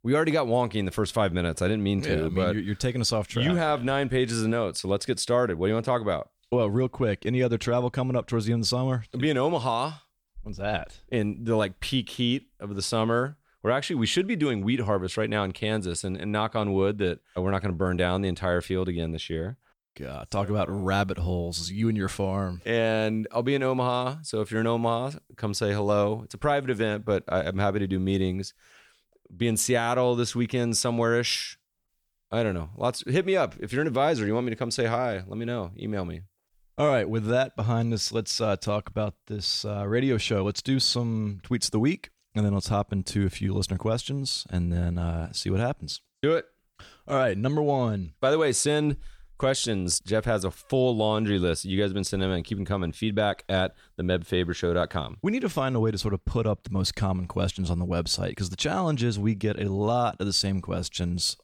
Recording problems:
none

